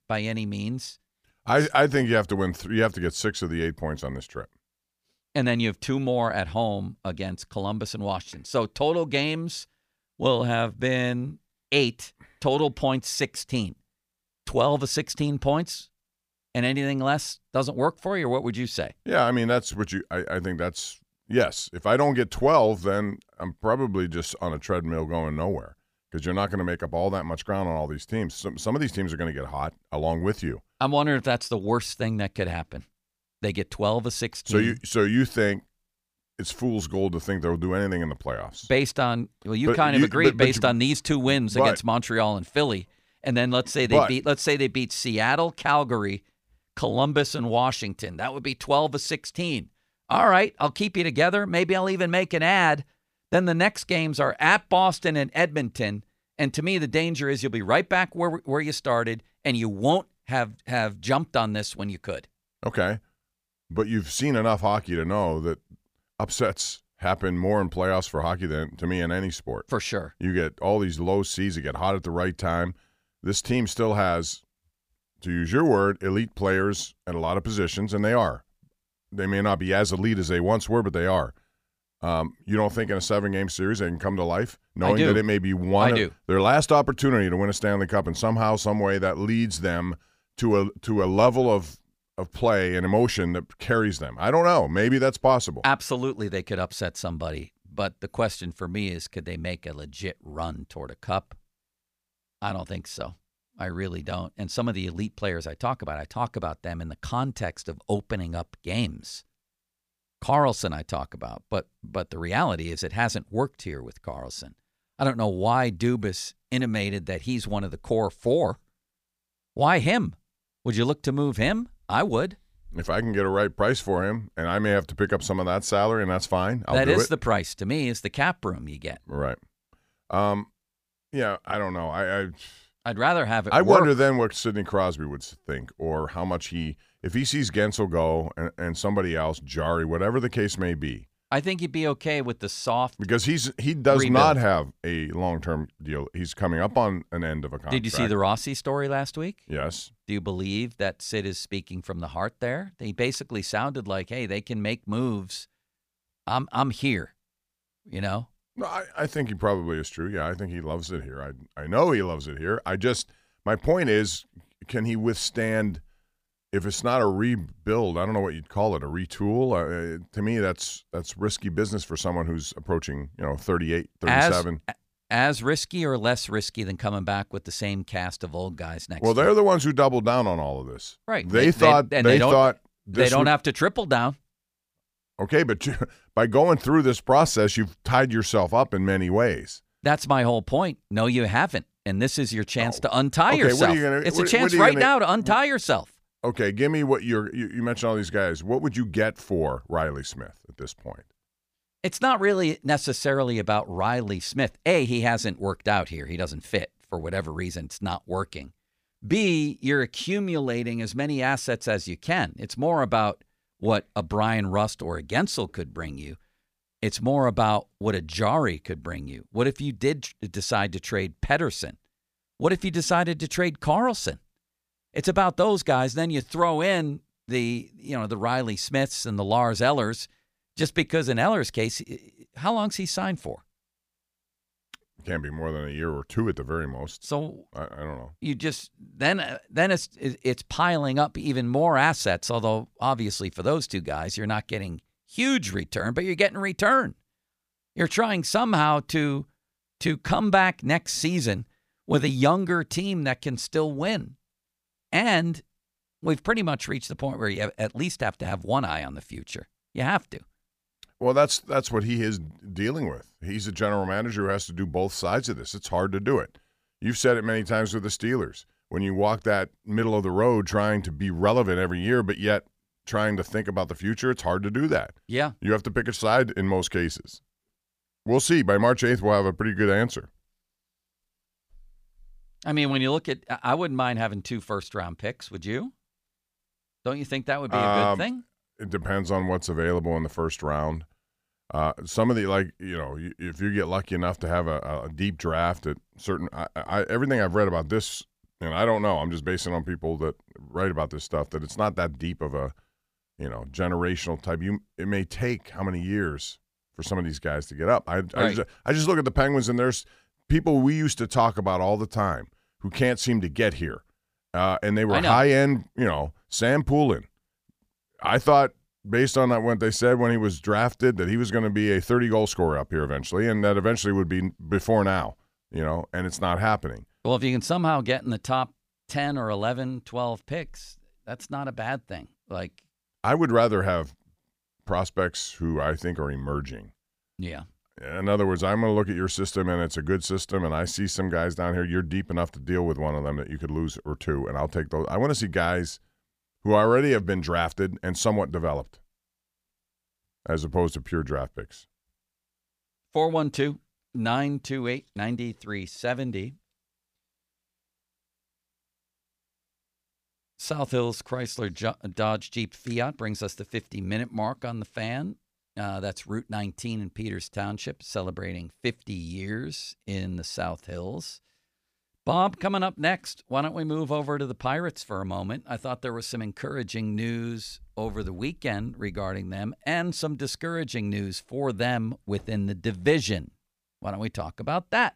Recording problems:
none

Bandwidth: 15 kHz